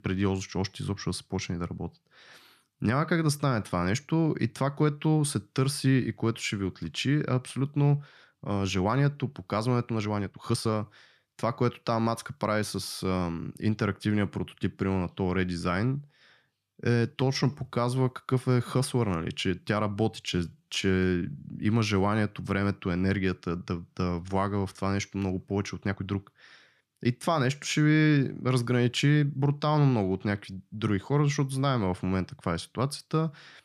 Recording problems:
uneven, jittery; strongly; from 2.5 to 26 s

